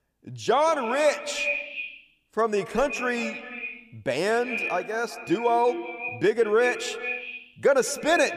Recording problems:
echo of what is said; strong; throughout; 180 ms later, 7 dB below the speech

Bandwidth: 14.5 kHz